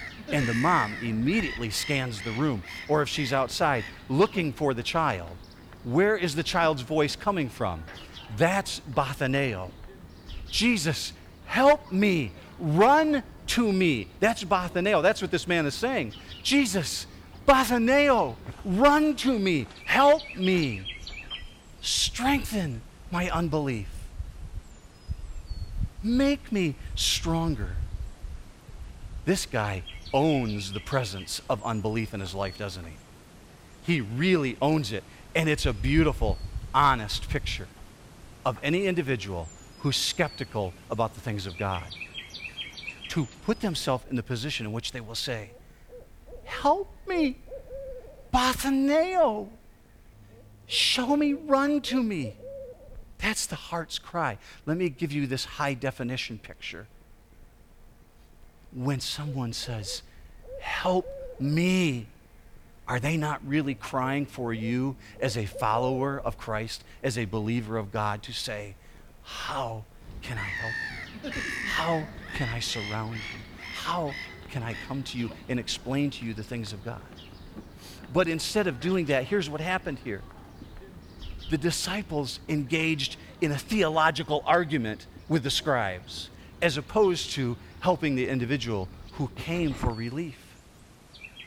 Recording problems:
animal sounds; noticeable; throughout; 15 dB below the speech

